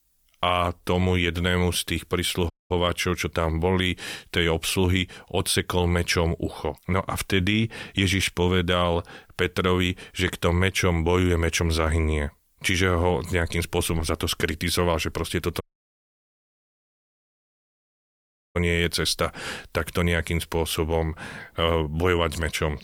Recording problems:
audio cutting out; at 2.5 s and at 16 s for 3 s

